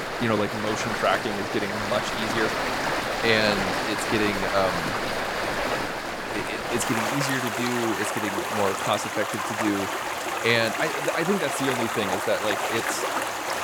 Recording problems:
rain or running water; very loud; throughout; as loud as the speech

